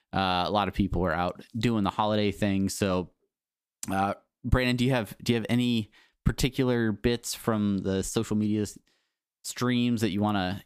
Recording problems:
none

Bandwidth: 15 kHz